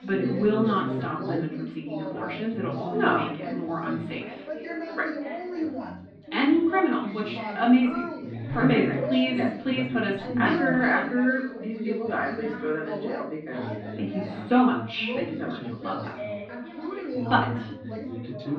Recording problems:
off-mic speech; far
muffled; slightly; fading above 4 kHz
room echo; slight; dies away in 0.5 s
background chatter; loud; throughout; 4 voices, 7 dB below the speech

